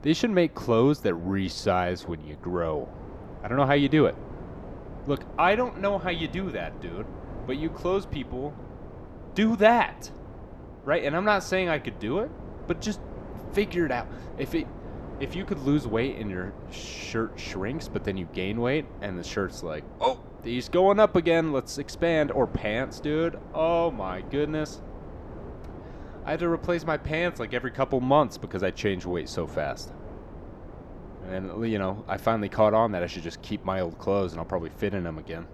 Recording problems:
wind noise on the microphone; occasional gusts; 20 dB below the speech

